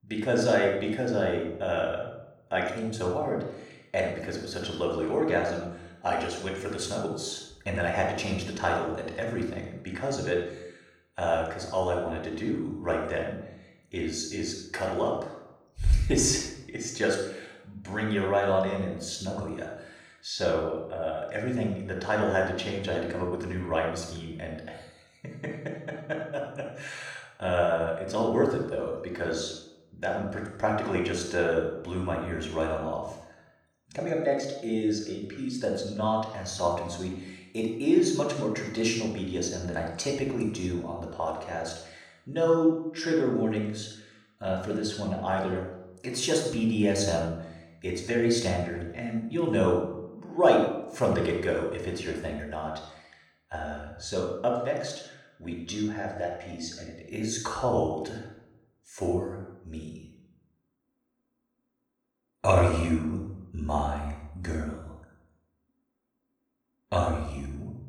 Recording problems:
off-mic speech; far
room echo; noticeable; dies away in 0.7 s

